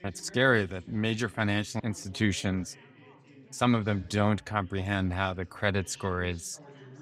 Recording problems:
chatter from many people; faint; throughout; 25 dB below the speech

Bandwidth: 15.5 kHz